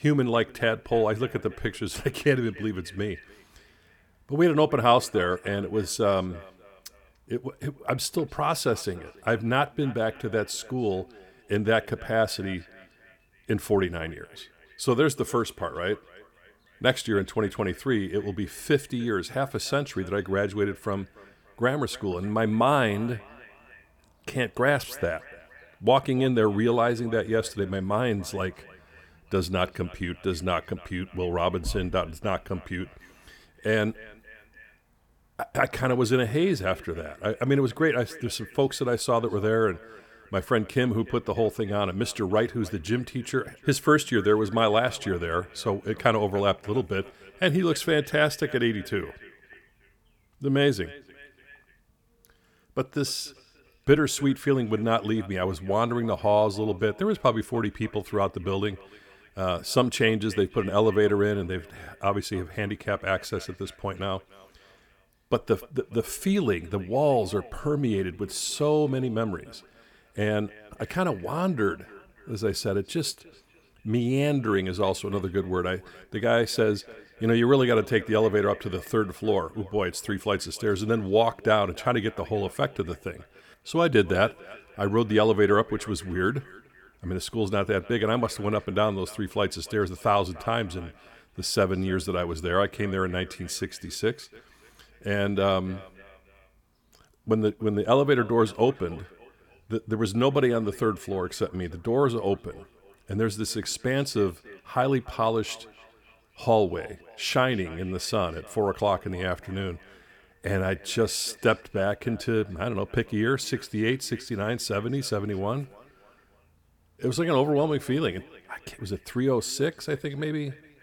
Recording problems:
echo of what is said; faint; throughout; 290 ms later, 25 dB below the speech

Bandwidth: 19 kHz